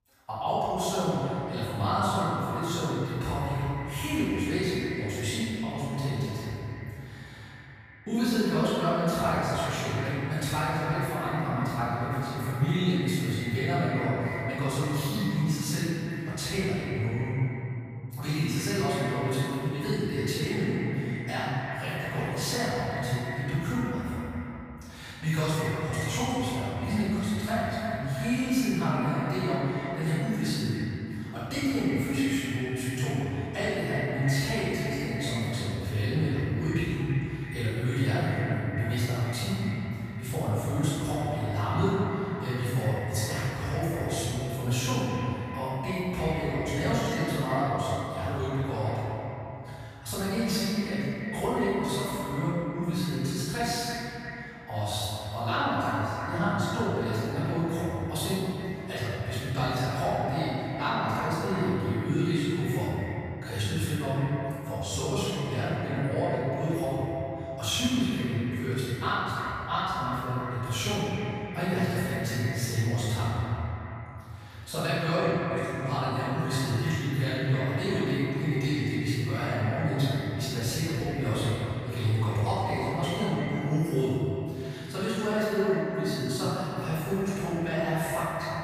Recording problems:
echo of what is said; strong; throughout; 340 ms later, 10 dB below the speech
room echo; strong; dies away in 2.5 s
off-mic speech; far

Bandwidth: 15 kHz